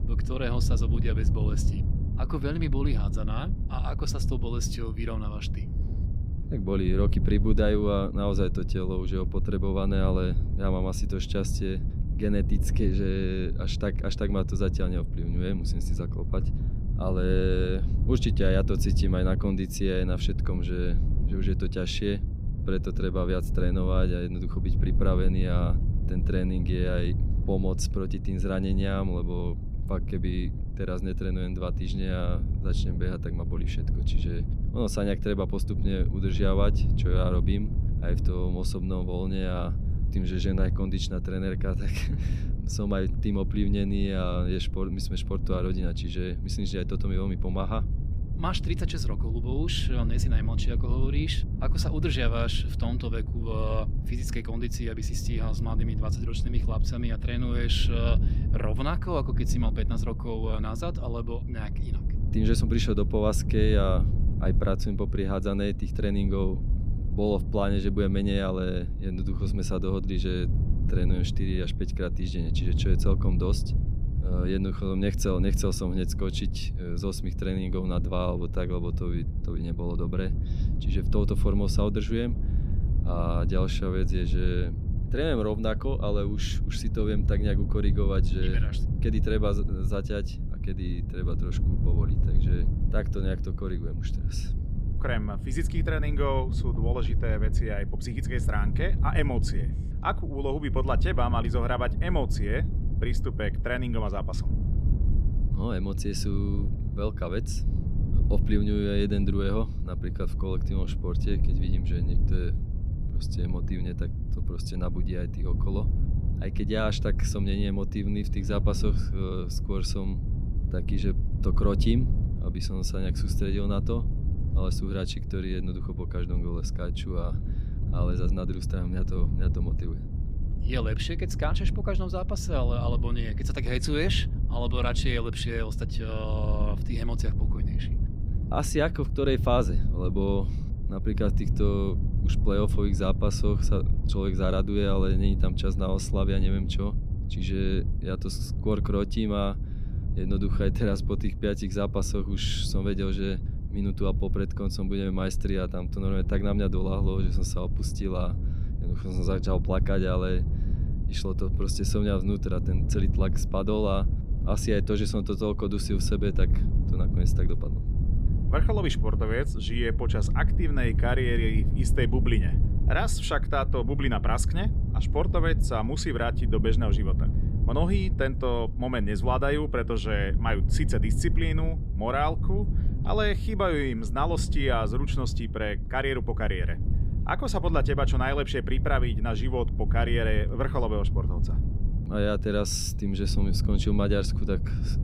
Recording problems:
wind noise on the microphone; occasional gusts; 10 dB below the speech

